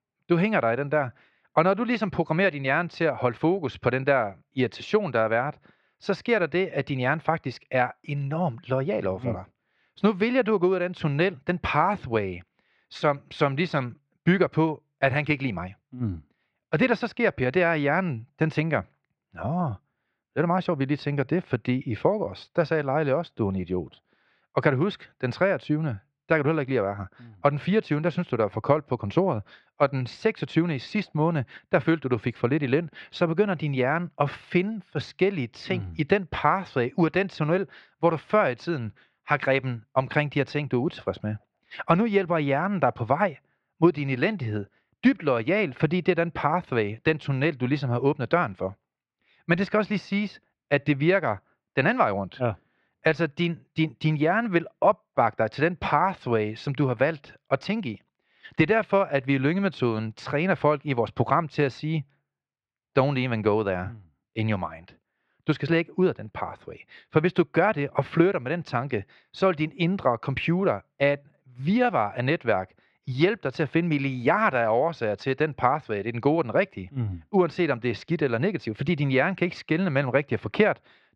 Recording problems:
muffled; very; fading above 2.5 kHz

